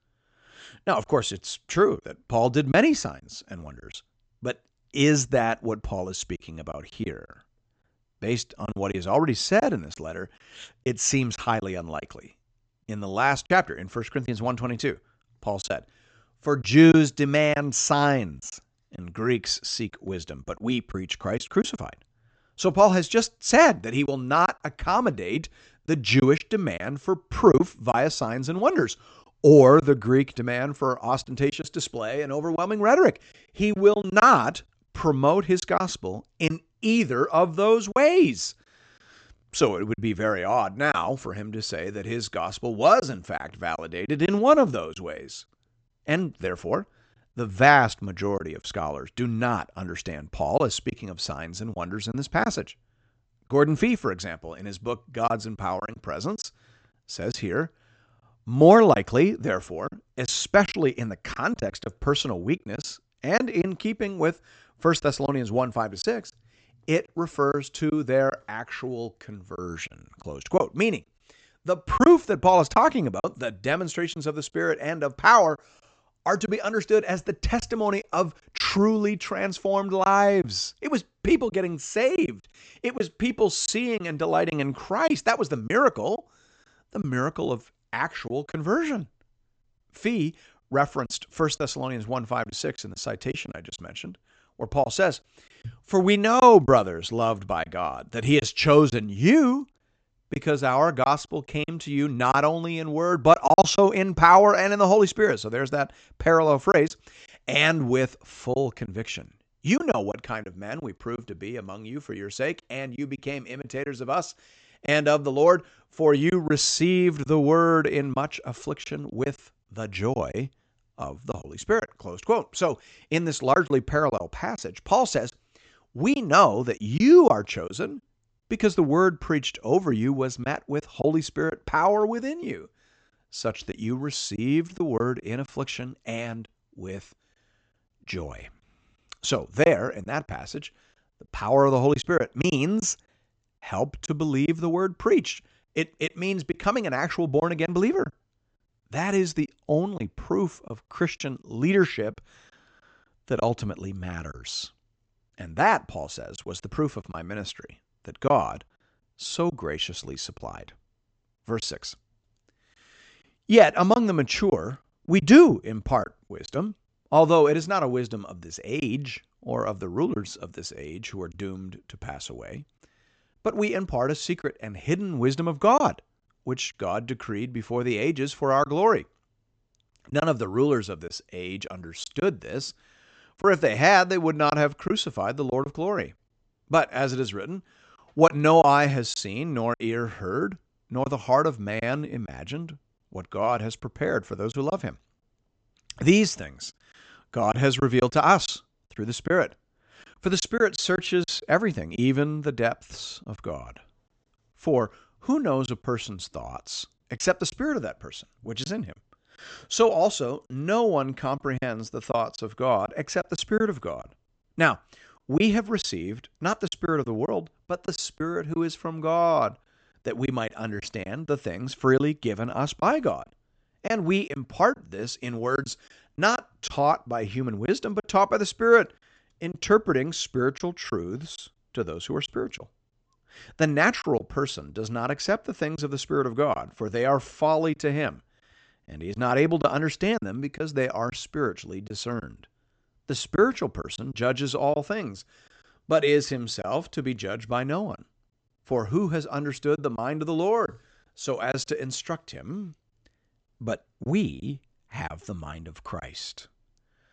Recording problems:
high frequencies cut off; noticeable; nothing above 8 kHz
choppy; occasionally; 4% of the speech affected

